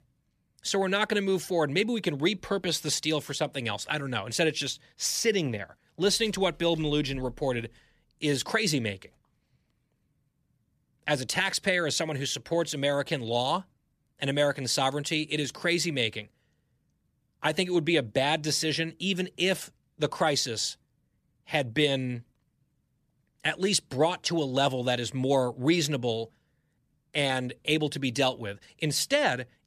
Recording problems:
none

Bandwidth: 14.5 kHz